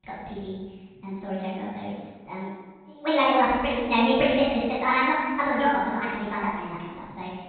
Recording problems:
room echo; strong; dies away in 1.2 s
off-mic speech; far
high frequencies cut off; severe; nothing above 4 kHz
wrong speed and pitch; too fast and too high; 1.5 times normal speed

